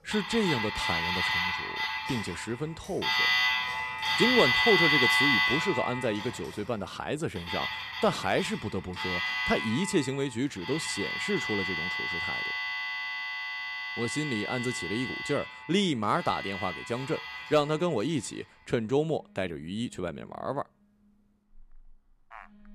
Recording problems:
alarms or sirens; very loud; throughout; 2 dB above the speech

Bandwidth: 14 kHz